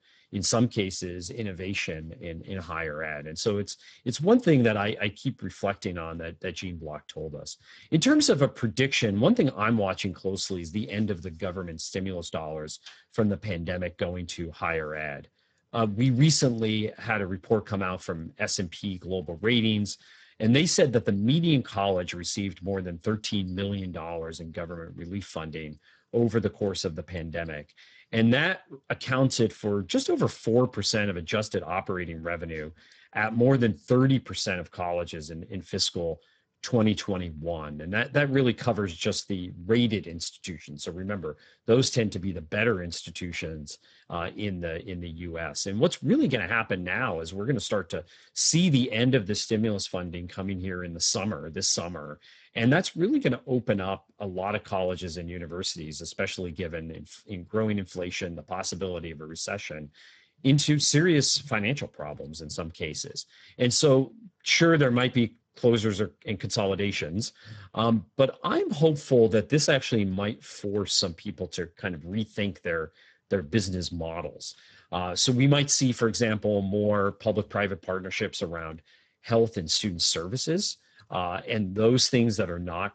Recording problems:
garbled, watery; badly; nothing above 8 kHz

